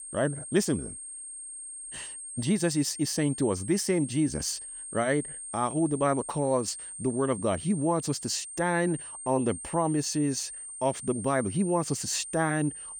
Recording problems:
high-pitched whine; loud; throughout; 8.5 kHz, 9 dB below the speech

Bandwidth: 18.5 kHz